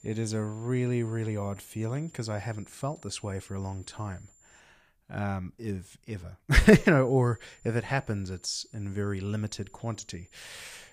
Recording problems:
high-pitched whine; faint; until 4.5 s and from 7 s on; 7 kHz, 30 dB below the speech

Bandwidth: 15 kHz